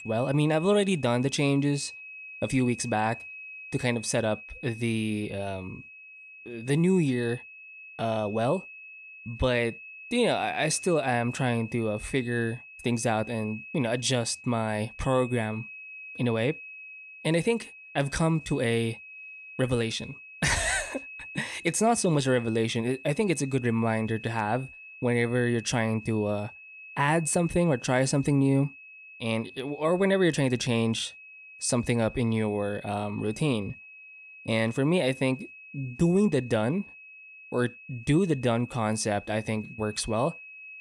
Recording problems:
high-pitched whine; noticeable; throughout; 2.5 kHz, 15 dB below the speech

